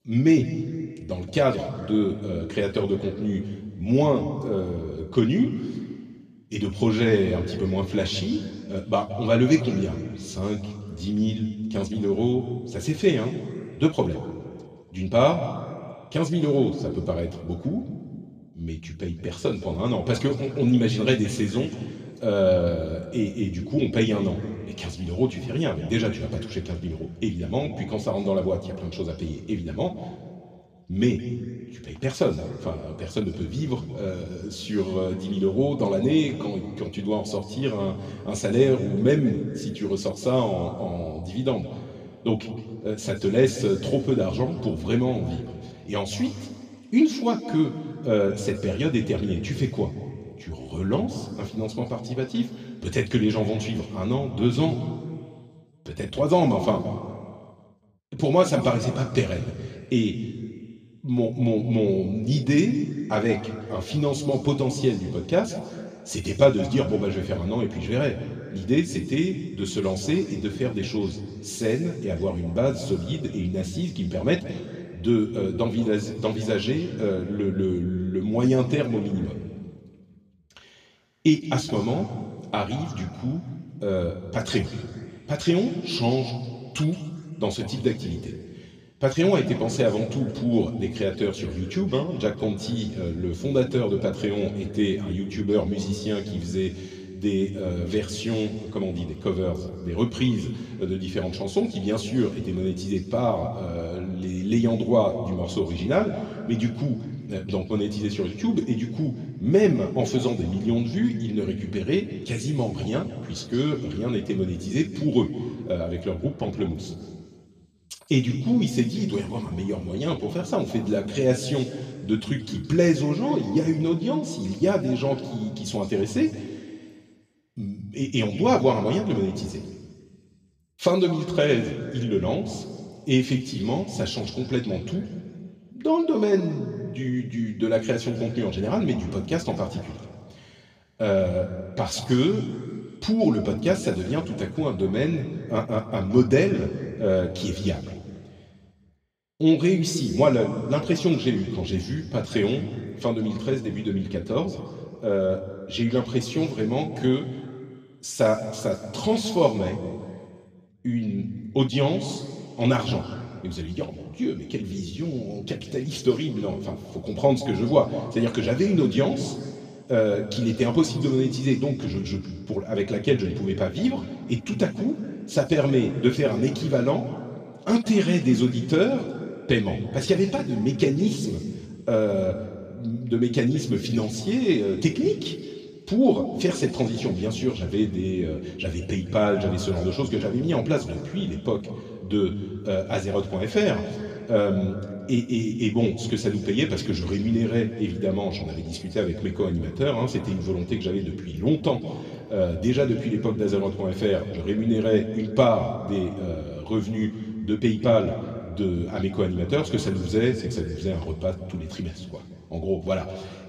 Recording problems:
room echo; slight; dies away in 1.8 s
off-mic speech; somewhat distant

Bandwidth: 14.5 kHz